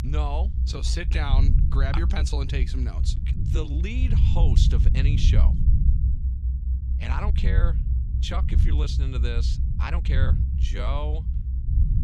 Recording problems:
low rumble; loud; throughout; 6 dB below the speech
uneven, jittery; strongly; from 0.5 to 11 s

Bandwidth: 14.5 kHz